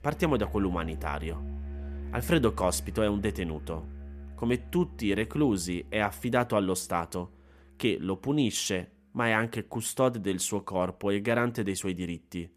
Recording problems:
background music; noticeable; throughout; 10 dB below the speech

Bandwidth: 14.5 kHz